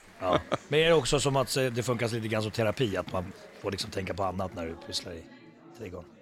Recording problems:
chatter from many people; faint; throughout; 20 dB below the speech

